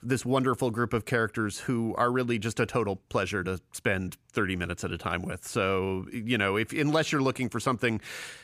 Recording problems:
none

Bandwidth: 15 kHz